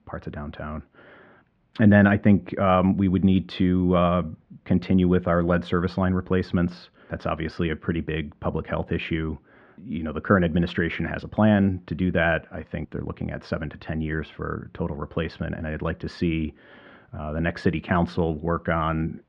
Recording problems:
muffled; very; fading above 2.5 kHz

